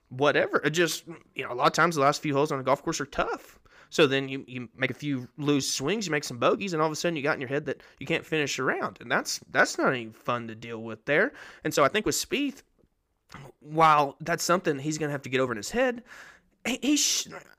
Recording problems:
uneven, jittery; strongly; from 0.5 to 17 s

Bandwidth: 15 kHz